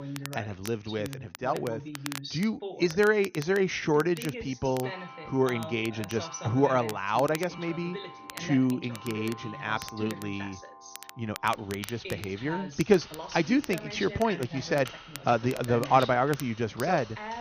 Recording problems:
high frequencies cut off; noticeable; nothing above 6.5 kHz
household noises; noticeable; from 4.5 s on; 20 dB below the speech
voice in the background; noticeable; throughout; 15 dB below the speech
crackle, like an old record; noticeable; 15 dB below the speech

